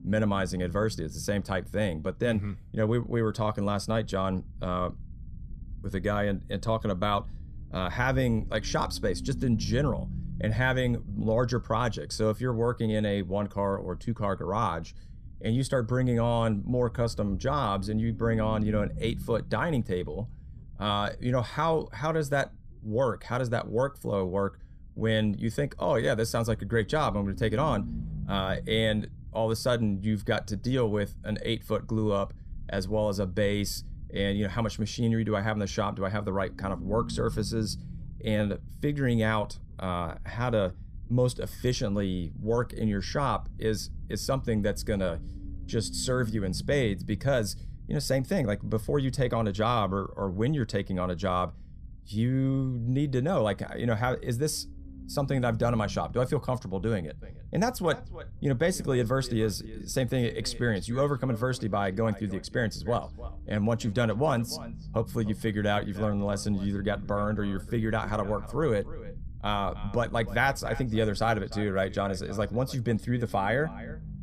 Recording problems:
echo of what is said; faint; from 57 s on; 300 ms later, 20 dB below the speech
low rumble; faint; throughout; 25 dB below the speech

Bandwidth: 14.5 kHz